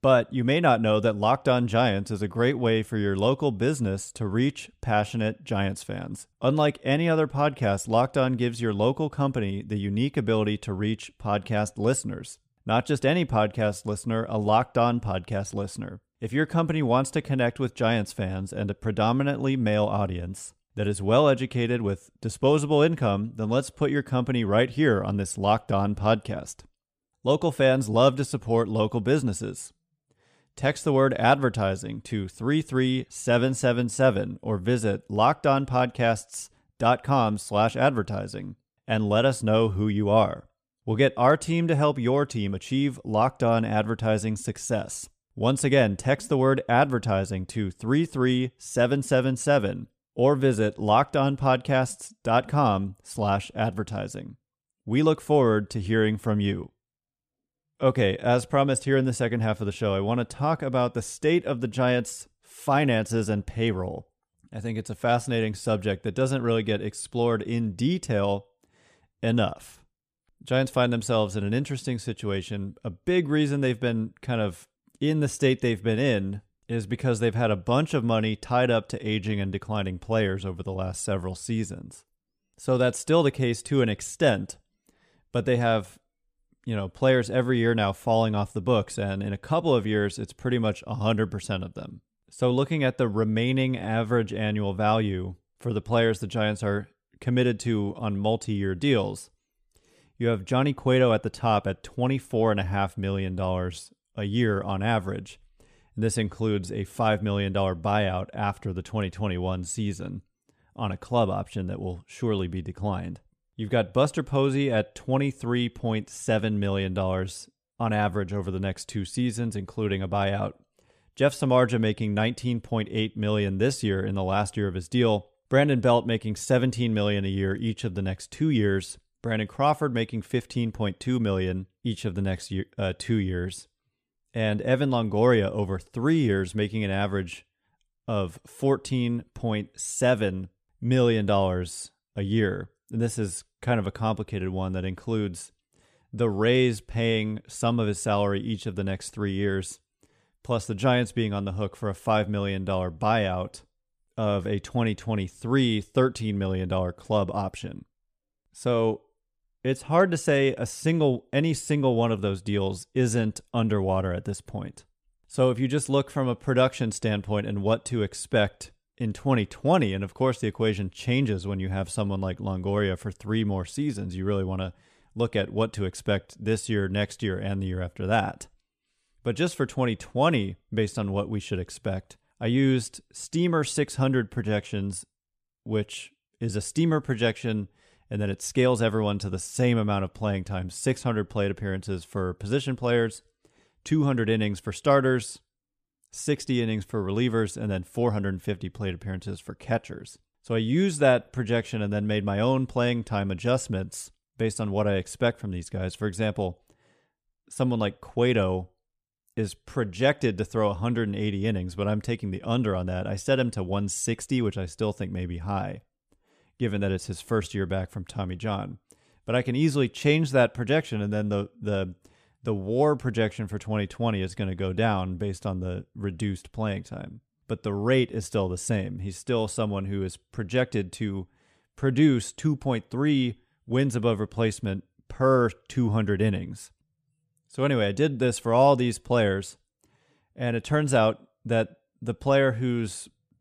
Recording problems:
none

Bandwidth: 14.5 kHz